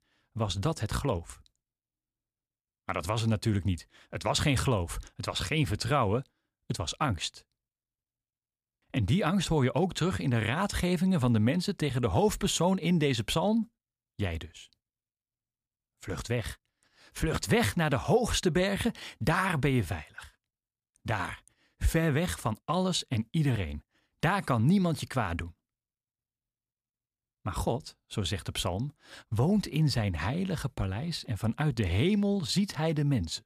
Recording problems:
none

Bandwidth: 15 kHz